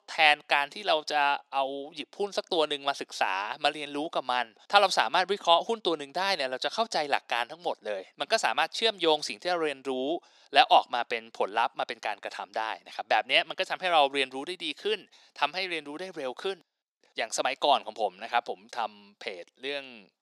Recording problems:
thin; somewhat; fading below 300 Hz

